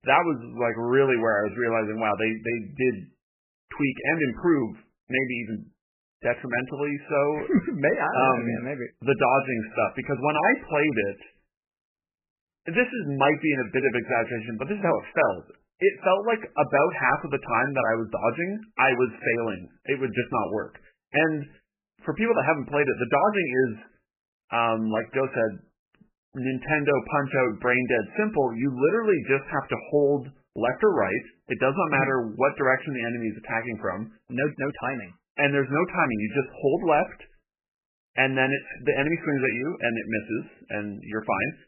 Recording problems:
garbled, watery; badly; nothing above 3 kHz

